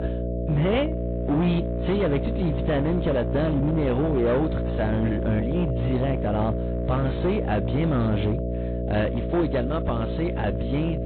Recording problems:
high frequencies cut off; severe; nothing above 4 kHz
distortion; slight; 11% of the sound clipped
garbled, watery; slightly
electrical hum; loud; throughout; 60 Hz, 5 dB below the speech

